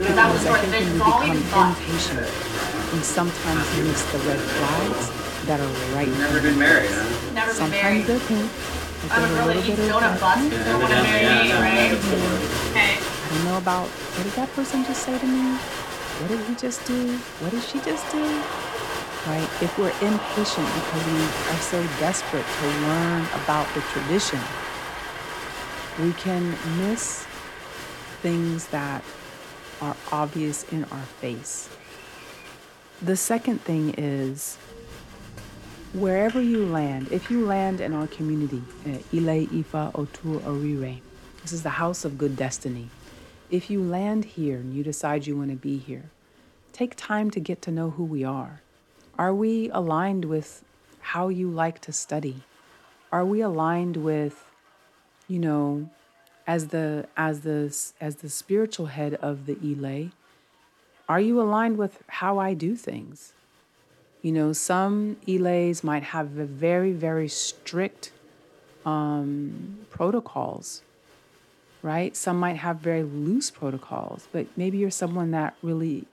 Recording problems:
crowd noise; very loud; throughout; 3 dB above the speech

